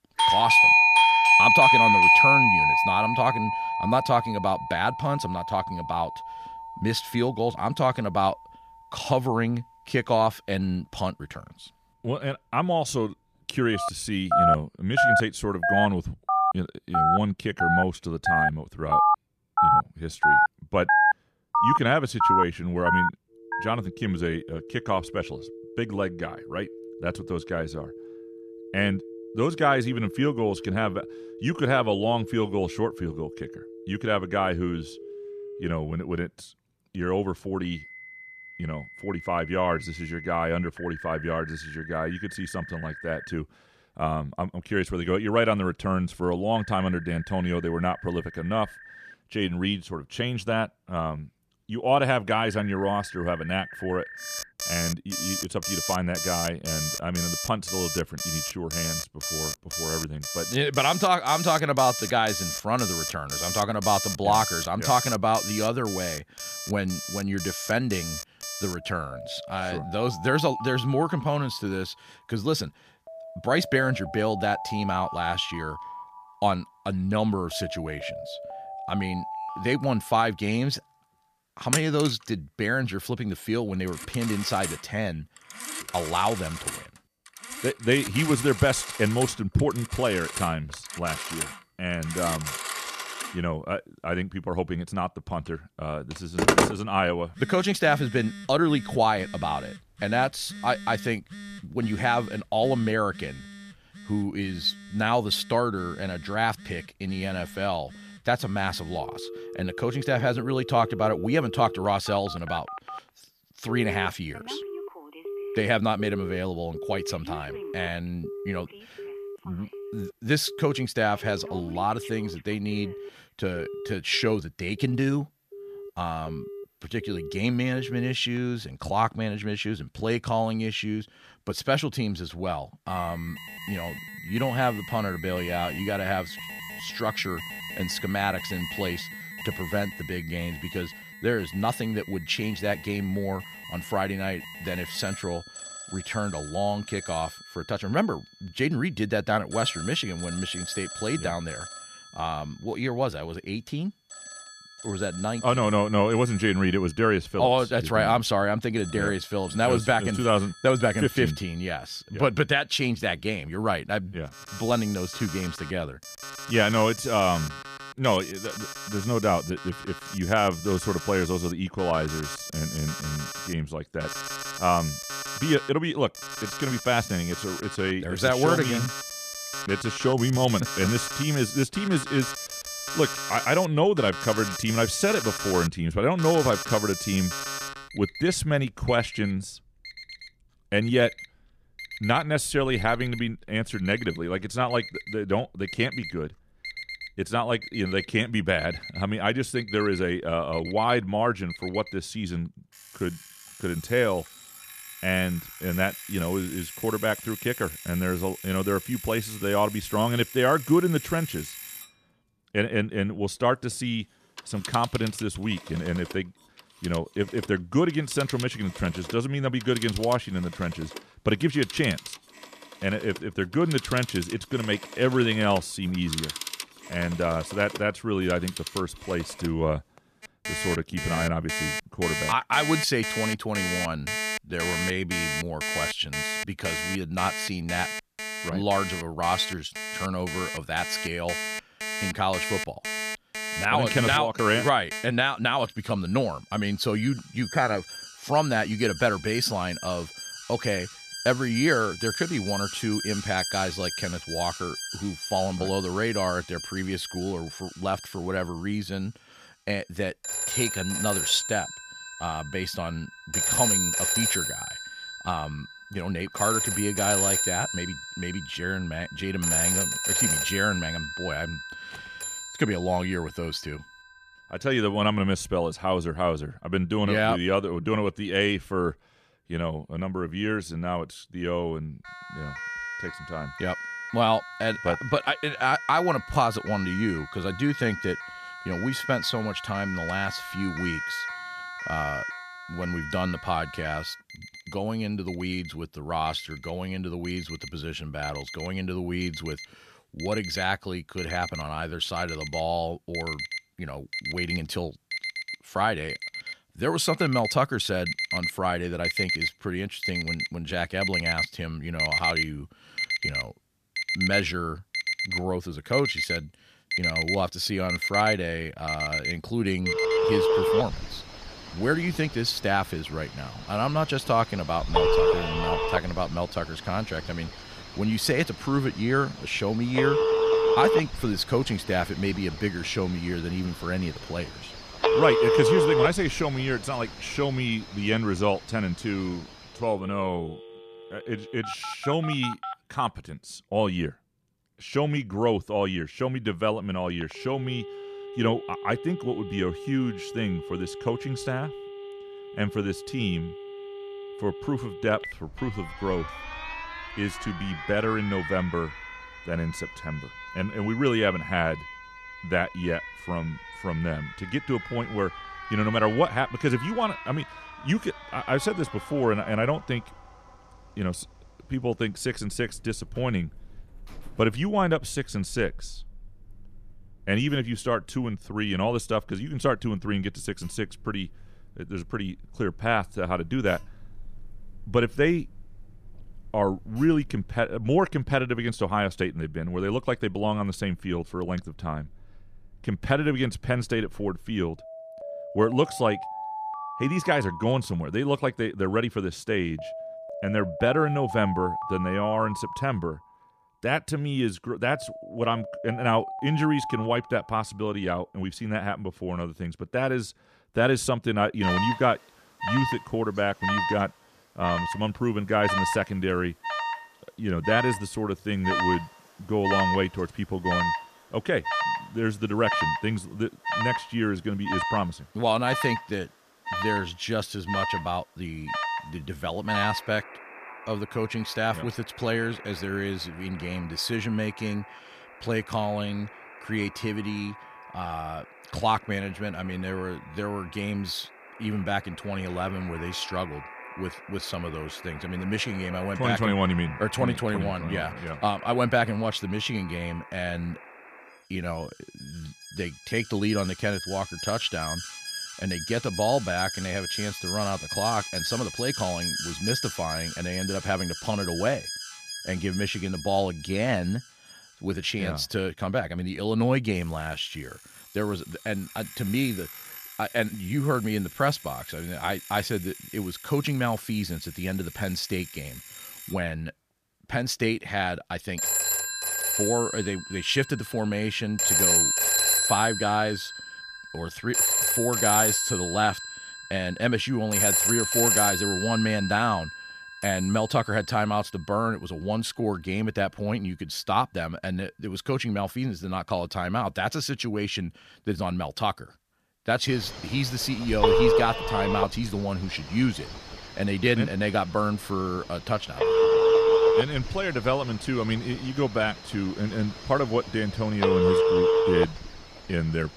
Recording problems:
alarms or sirens; loud; throughout; 1 dB below the speech

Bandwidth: 14.5 kHz